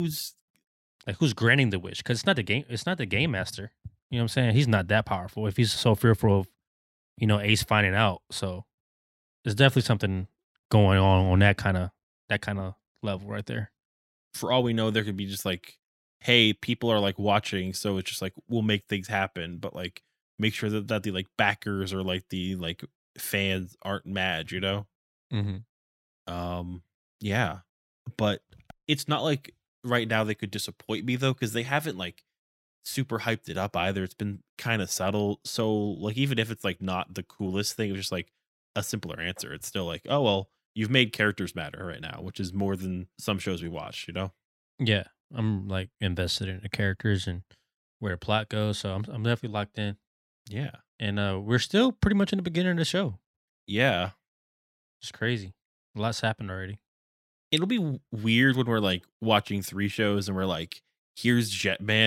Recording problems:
abrupt cut into speech; at the start and the end

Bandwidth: 16 kHz